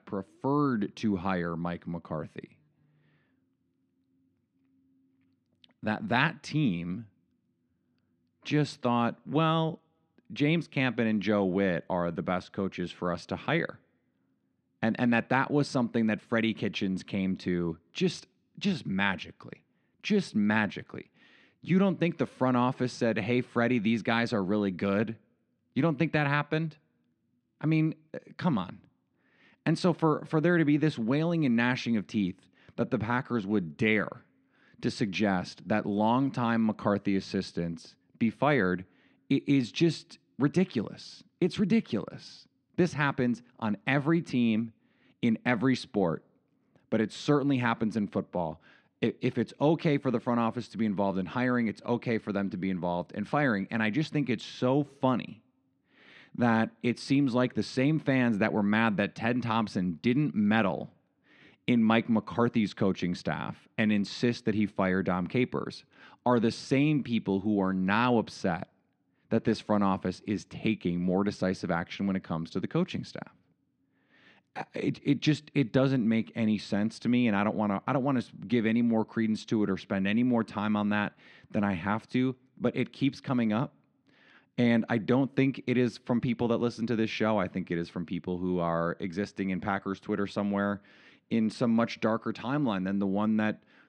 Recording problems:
muffled; slightly; fading above 3 kHz

